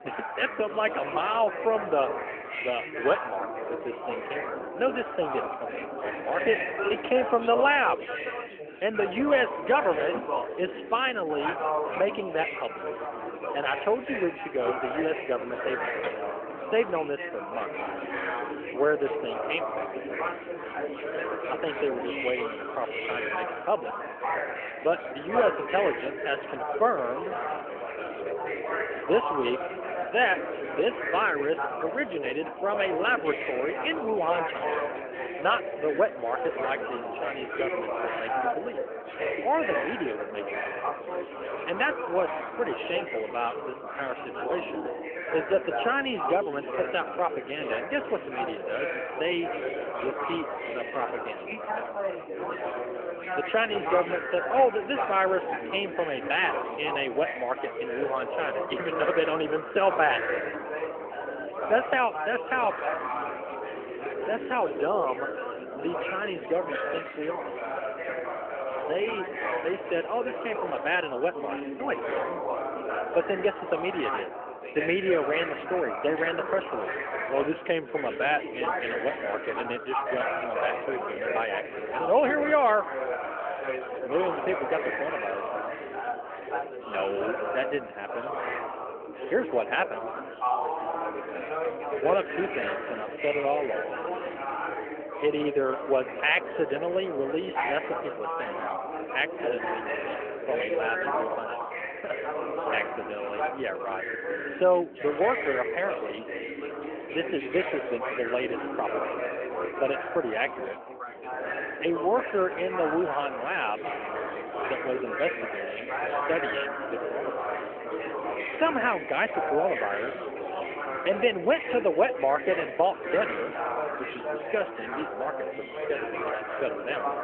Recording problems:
phone-call audio; nothing above 3 kHz
chatter from many people; loud; throughout; 3 dB below the speech

